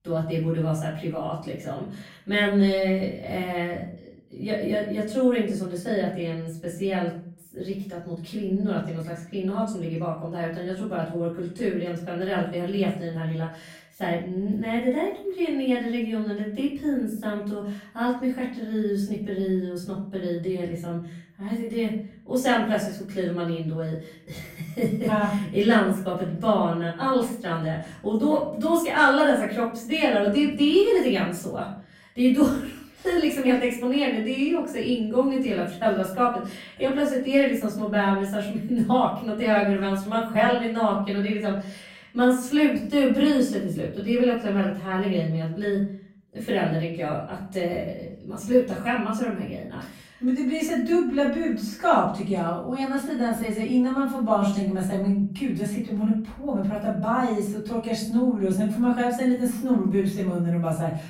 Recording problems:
off-mic speech; far
room echo; noticeable; dies away in 0.5 s

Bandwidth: 16 kHz